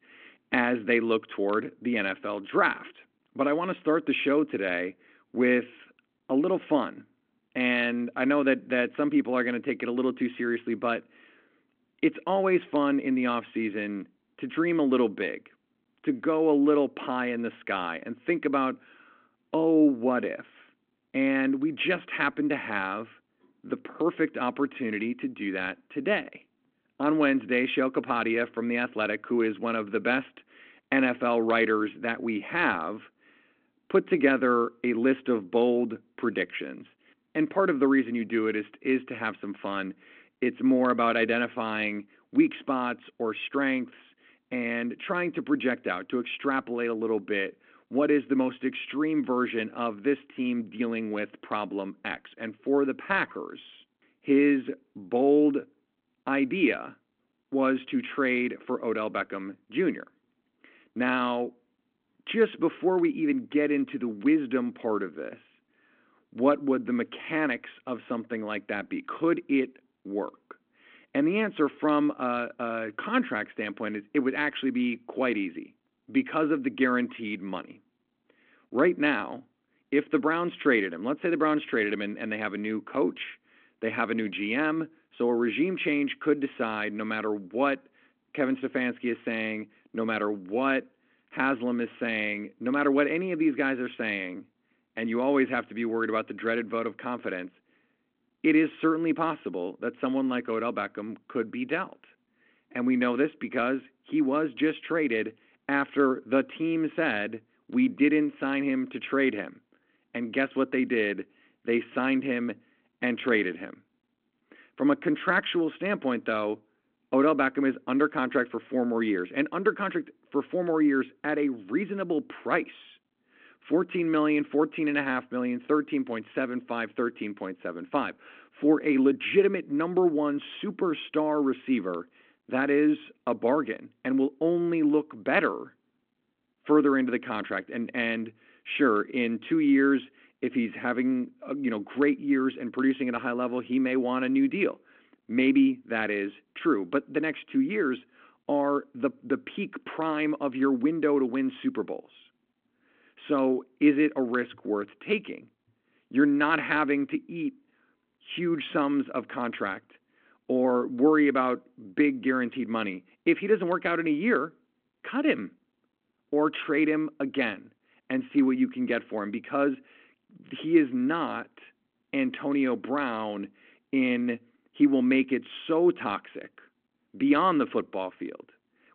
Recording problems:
phone-call audio

